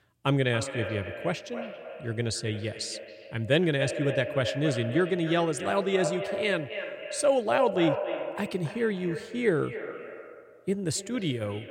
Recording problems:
echo of what is said; strong; throughout; 280 ms later, 7 dB below the speech

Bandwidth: 16 kHz